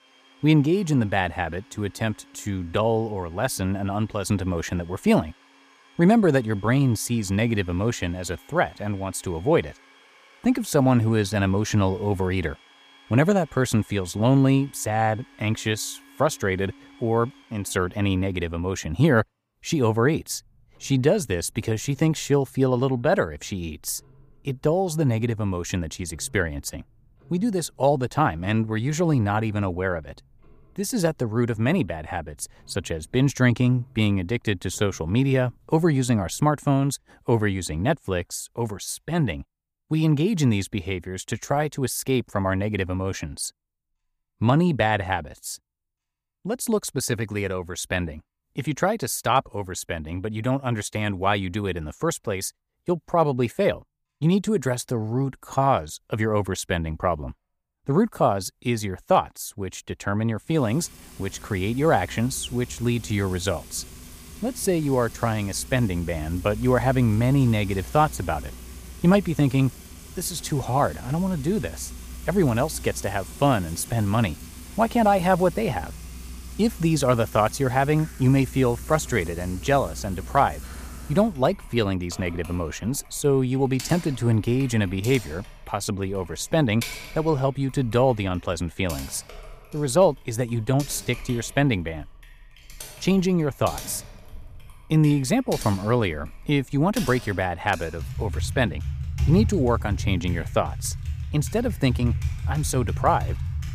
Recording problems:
household noises; noticeable; throughout; 15 dB below the speech

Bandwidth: 15 kHz